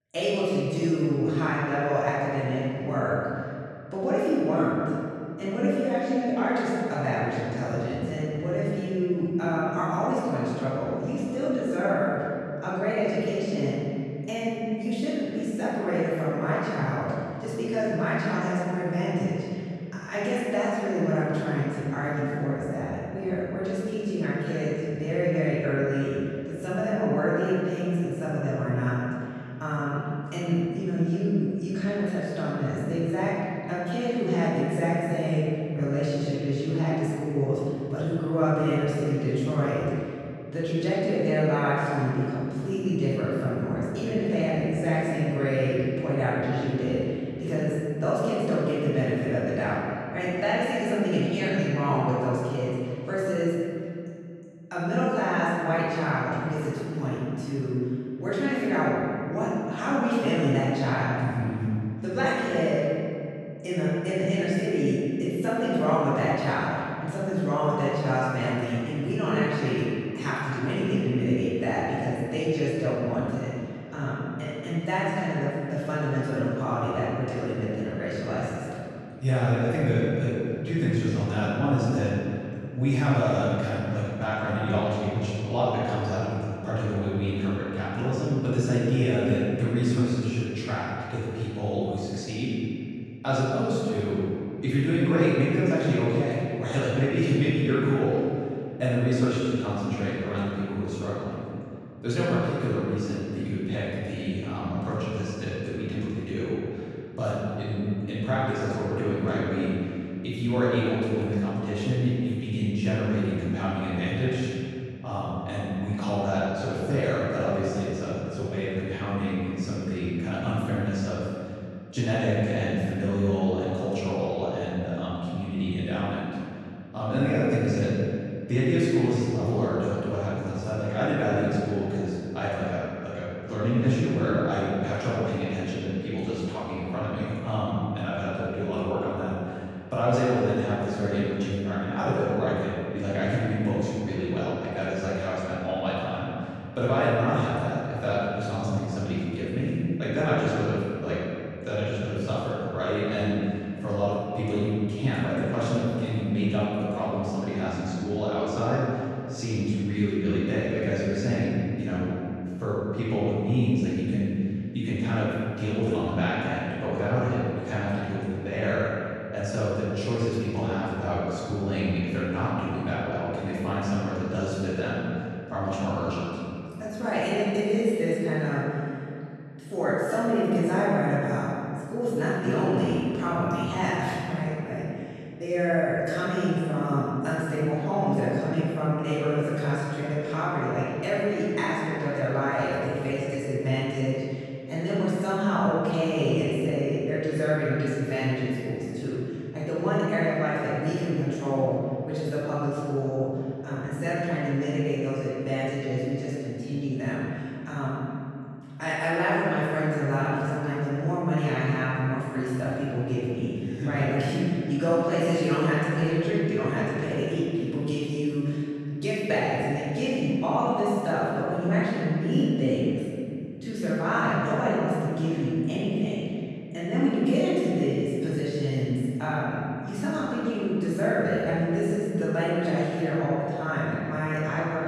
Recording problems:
room echo; strong; dies away in 2.4 s
off-mic speech; far

